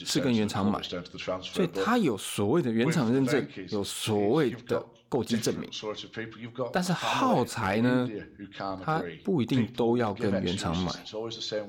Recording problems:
voice in the background; loud; throughout; 8 dB below the speech

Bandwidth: 17.5 kHz